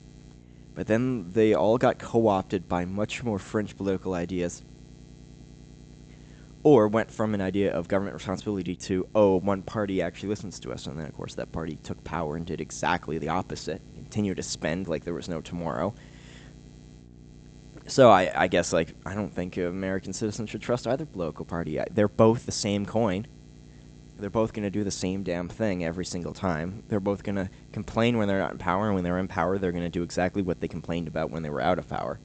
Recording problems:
high frequencies cut off; noticeable; nothing above 8 kHz
electrical hum; faint; throughout; 60 Hz, 30 dB below the speech

